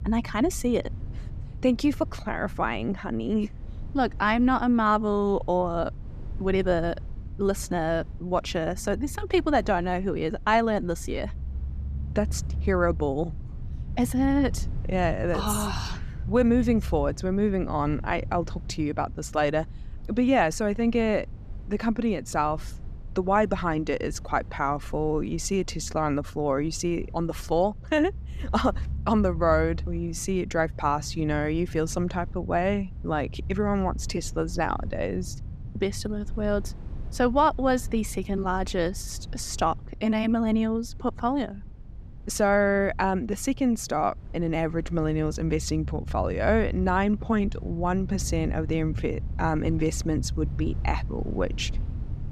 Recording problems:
low rumble; faint; throughout; 25 dB below the speech

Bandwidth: 14.5 kHz